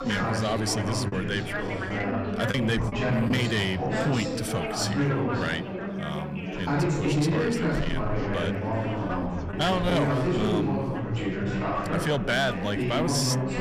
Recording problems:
distortion; slight; 10 dB below the speech
chatter from many people; very loud; throughout; 1 dB above the speech
choppy; very; from 1 to 3.5 s; 6% of the speech affected

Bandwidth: 15 kHz